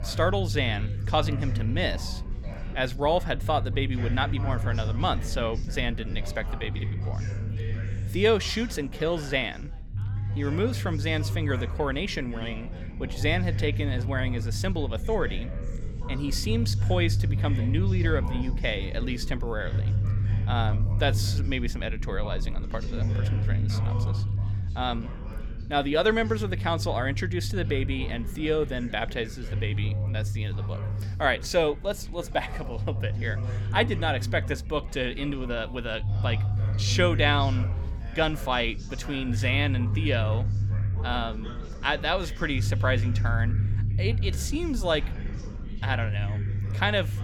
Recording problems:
background chatter; noticeable; throughout; 3 voices, 15 dB below the speech
low rumble; noticeable; throughout; 15 dB below the speech

